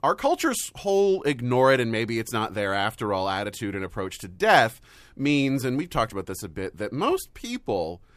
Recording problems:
none

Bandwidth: 14.5 kHz